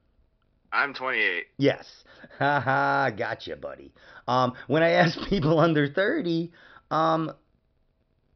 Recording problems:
high frequencies cut off; noticeable; nothing above 5.5 kHz

